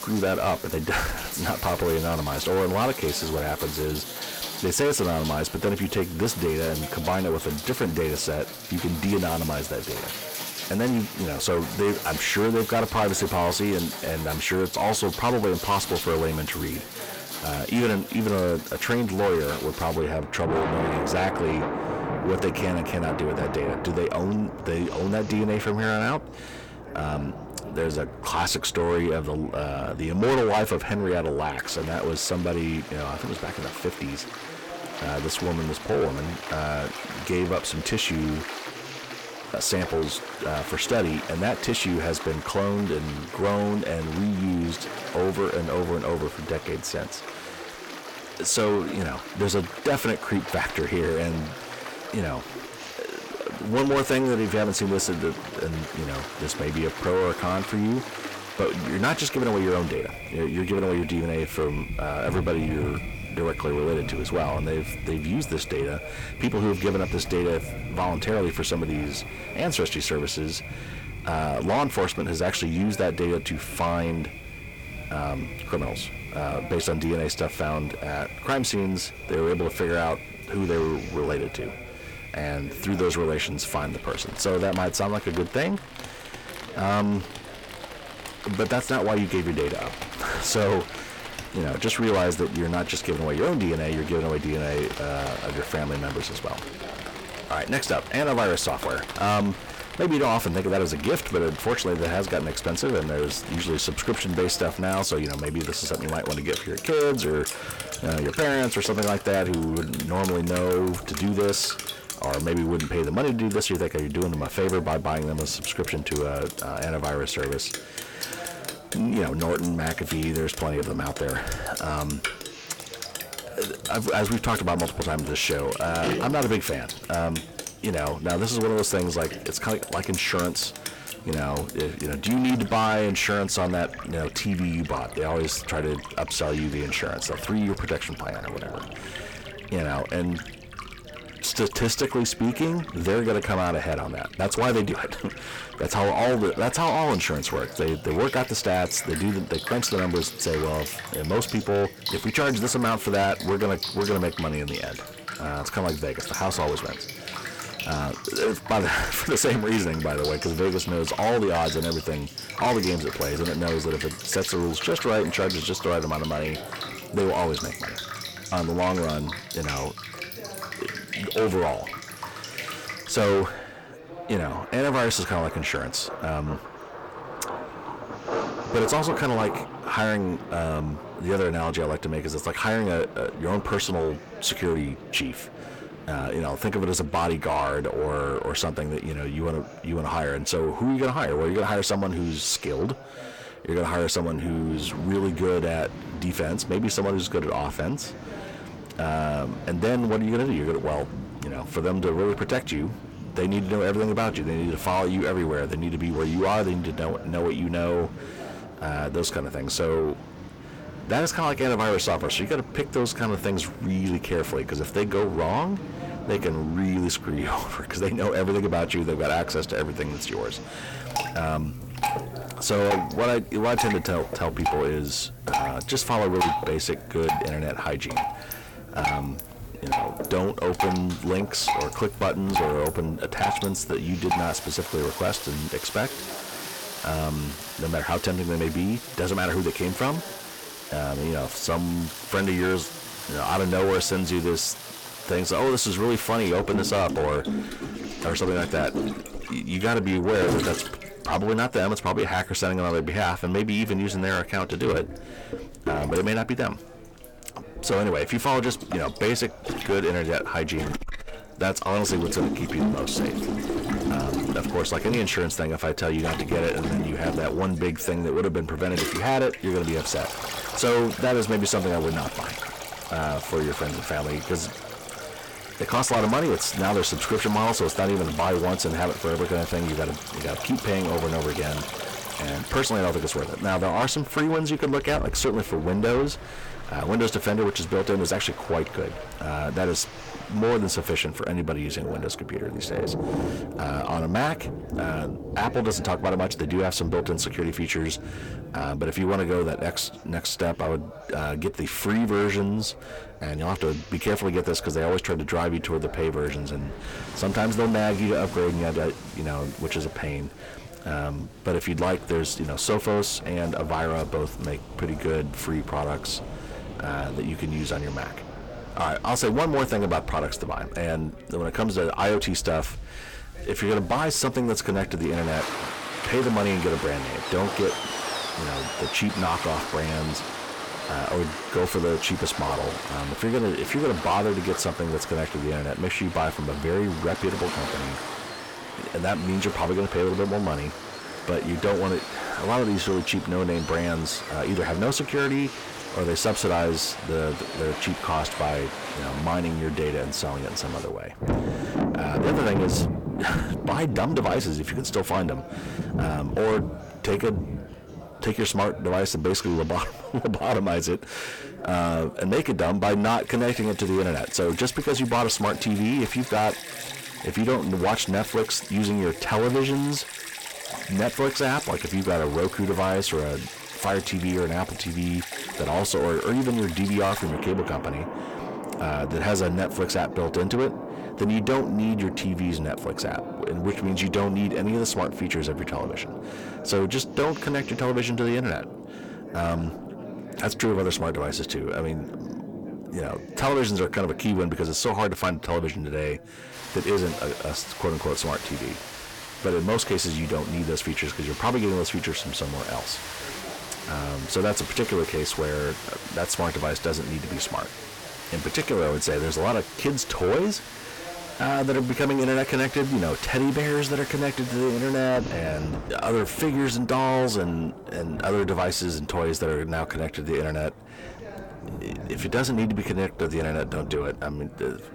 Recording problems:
distortion; heavy; 6 dB below the speech
rain or running water; loud; throughout; 9 dB below the speech
background chatter; noticeable; throughout; 3 voices, 20 dB below the speech

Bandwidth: 18 kHz